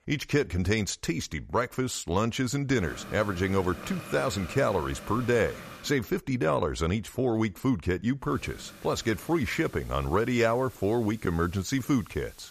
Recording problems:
hiss; noticeable; from 3 to 6 s and from 8.5 s on; 15 dB below the speech

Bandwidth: 14.5 kHz